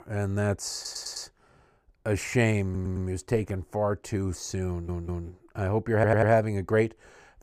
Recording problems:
audio stuttering; 4 times, first at 1 s

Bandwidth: 15 kHz